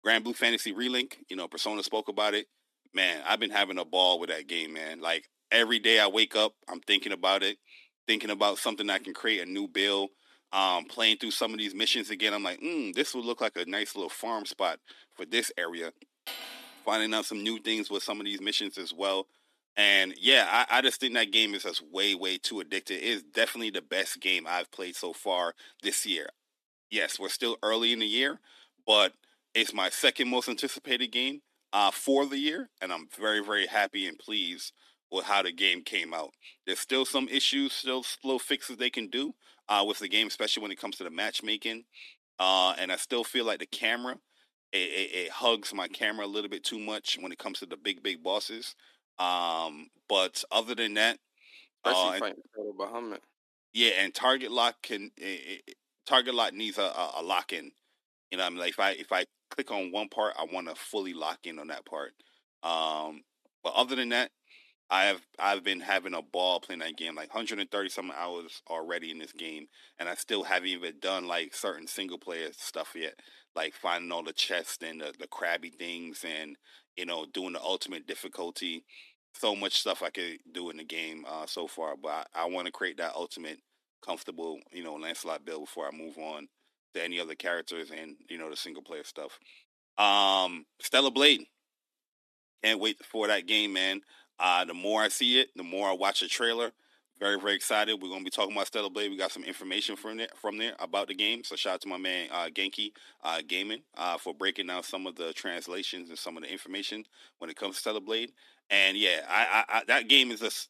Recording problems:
thin; somewhat; fading below 300 Hz
clattering dishes; faint; at 16 s; peak 10 dB below the speech

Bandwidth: 13.5 kHz